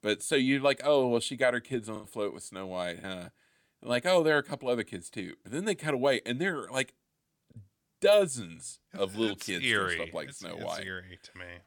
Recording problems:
choppy; occasionally; 2% of the speech affected

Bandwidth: 17.5 kHz